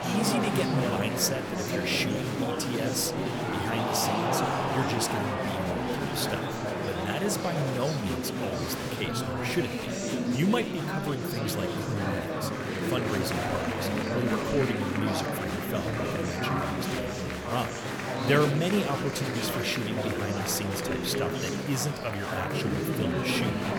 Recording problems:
murmuring crowd; very loud; throughout; 2 dB above the speech

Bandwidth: 19 kHz